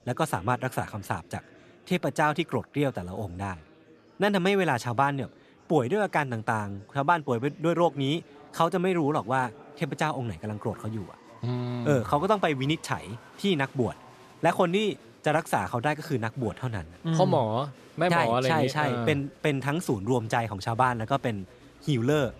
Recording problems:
murmuring crowd; faint; throughout; 25 dB below the speech

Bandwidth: 13.5 kHz